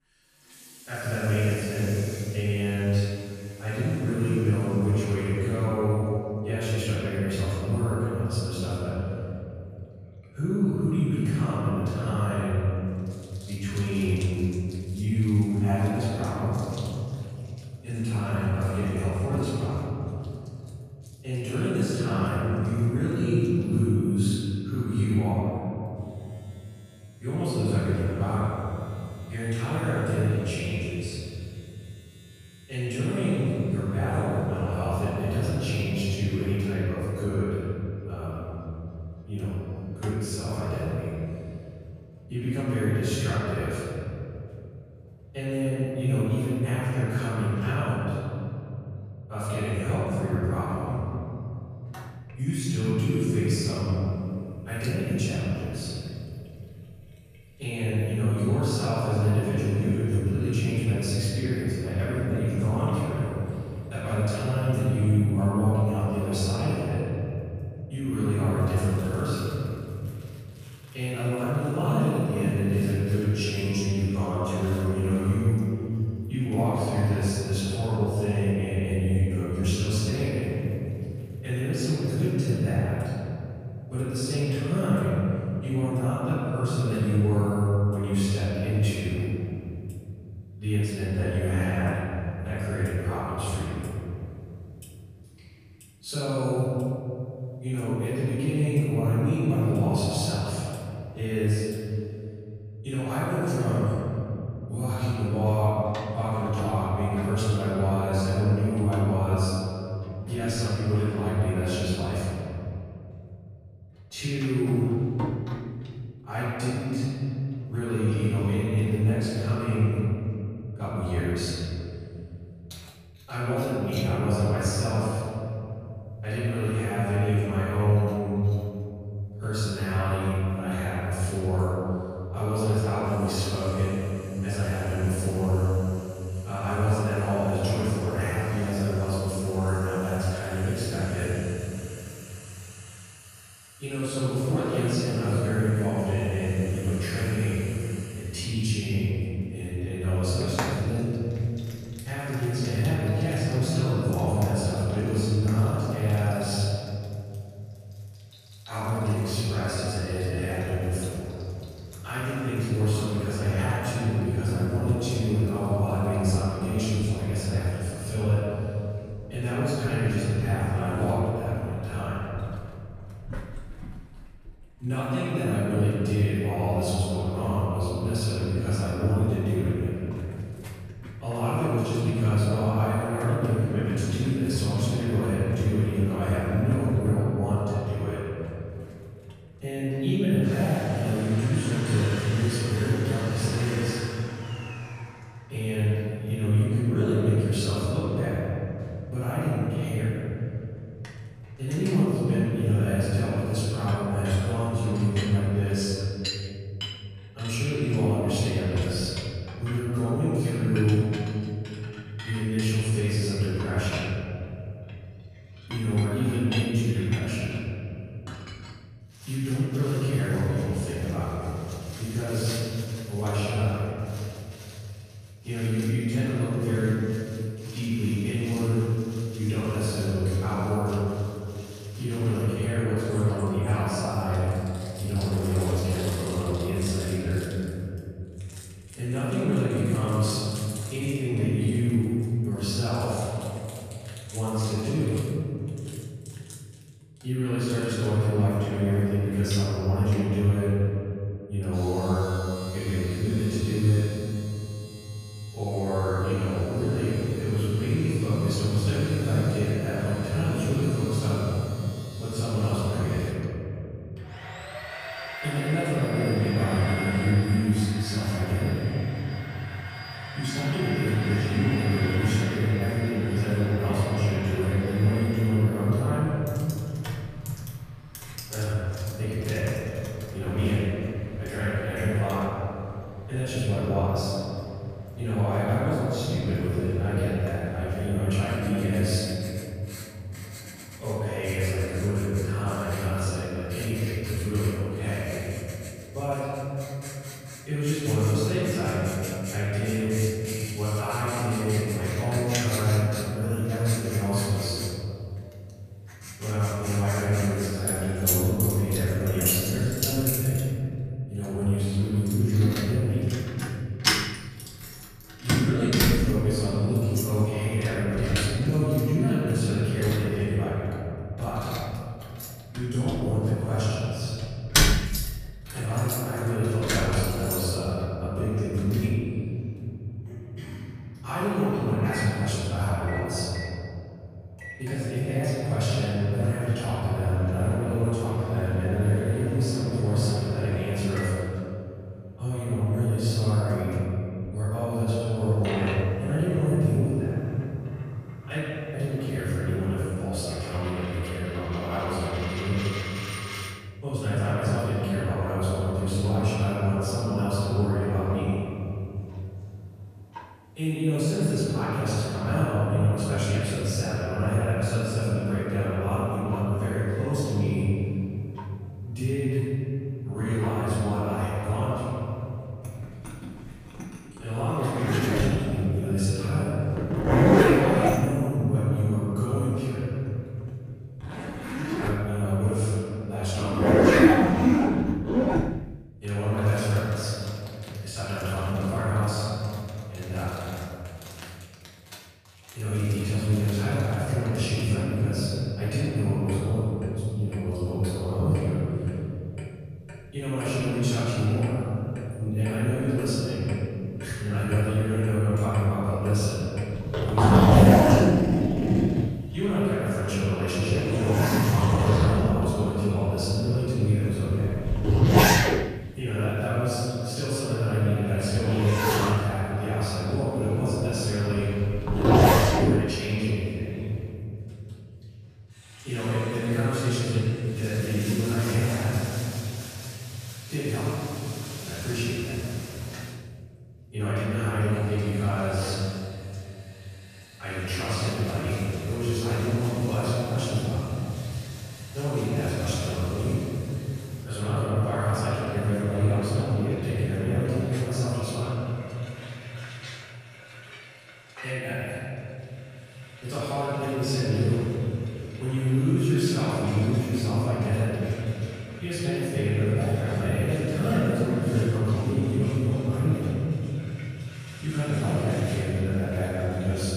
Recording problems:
room echo; strong; dies away in 3 s
off-mic speech; far
household noises; loud; throughout; 4 dB below the speech

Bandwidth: 14.5 kHz